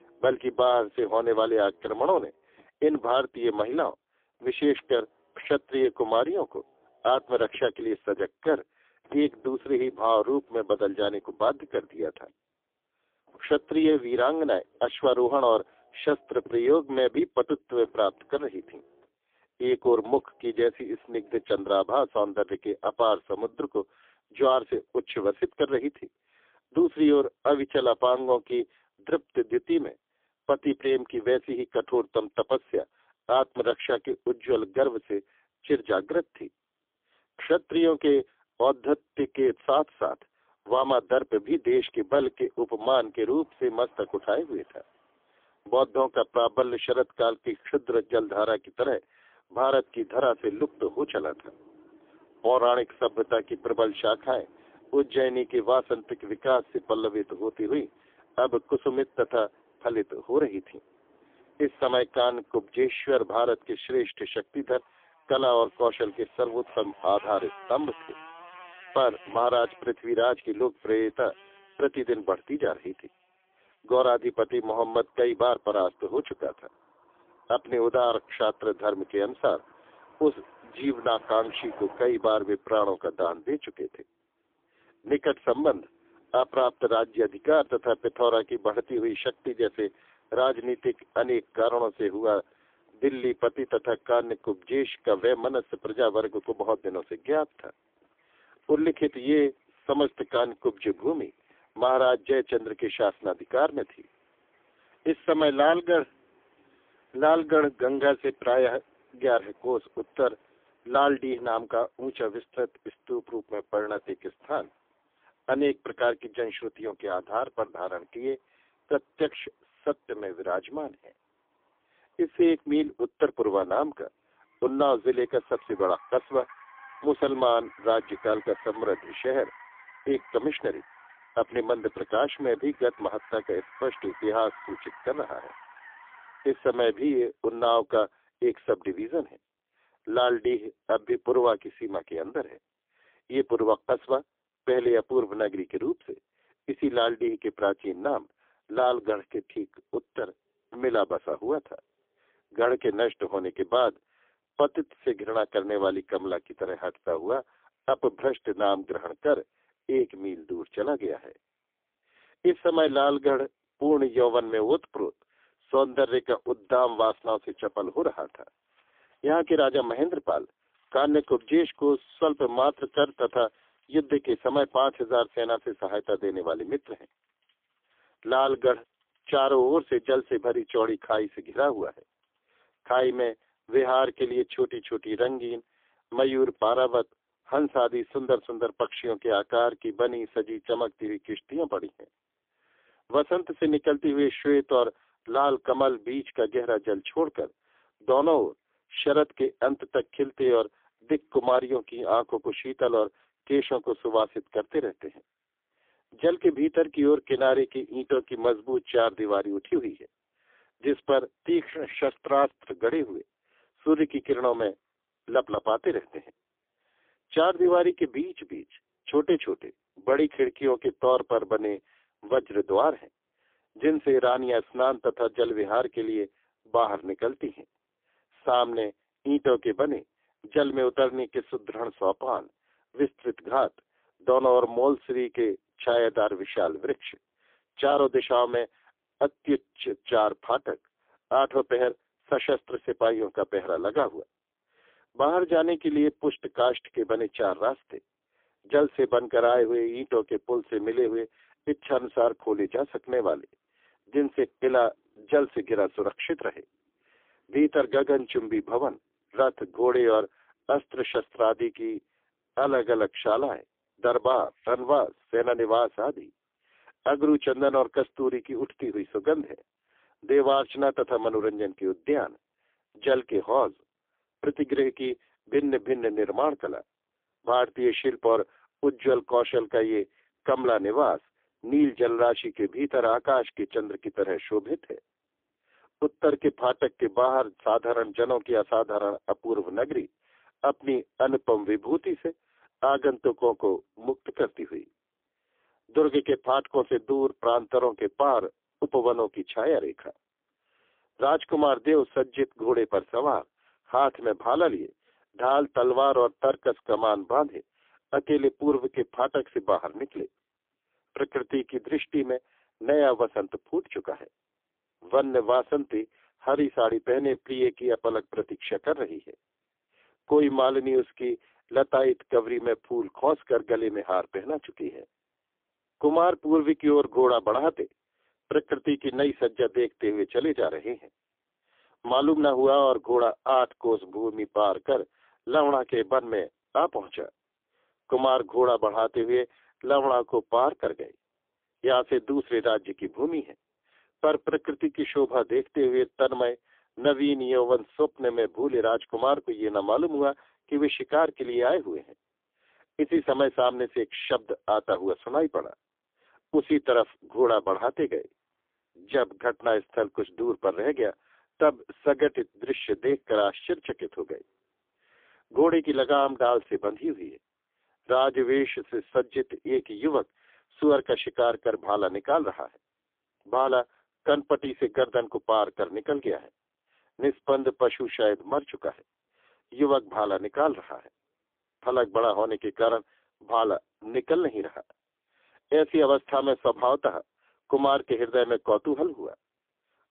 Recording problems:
phone-call audio; poor line; nothing above 3.5 kHz
traffic noise; faint; throughout; 25 dB below the speech

